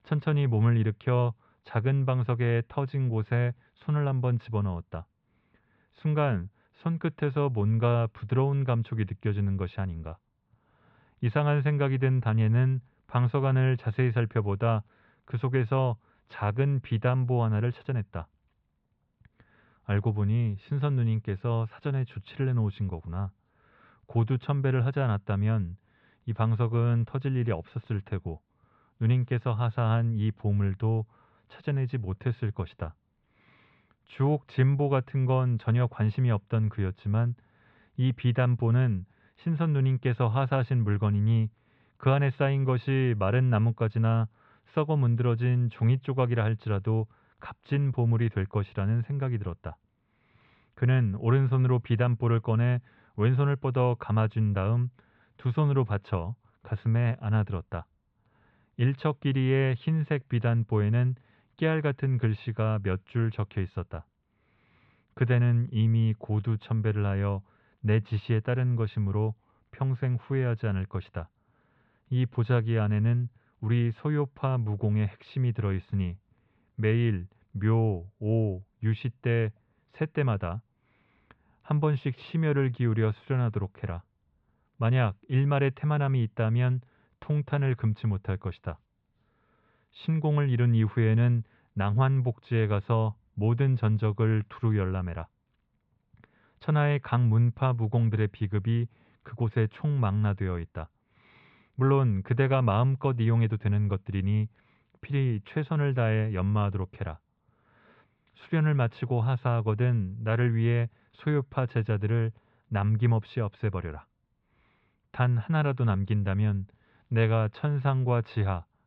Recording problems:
muffled; slightly; fading above 4 kHz

